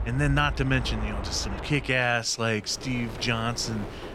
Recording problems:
train or aircraft noise; loud; until 2 s; 8 dB below the speech
wind noise on the microphone; occasional gusts; 20 dB below the speech

